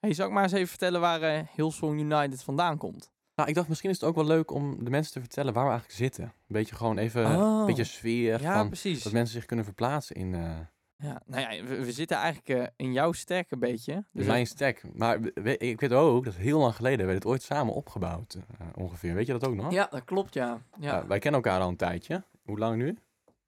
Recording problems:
none

